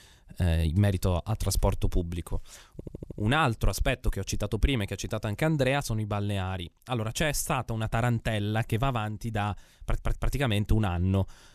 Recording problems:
audio stuttering; at 2.5 s and at 10 s

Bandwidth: 14.5 kHz